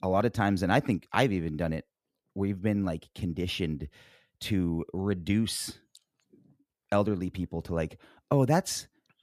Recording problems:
none

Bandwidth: 14.5 kHz